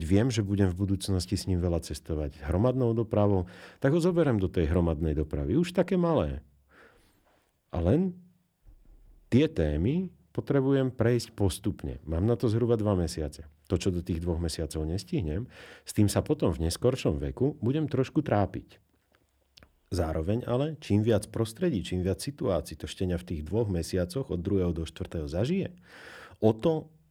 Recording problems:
abrupt cut into speech; at the start

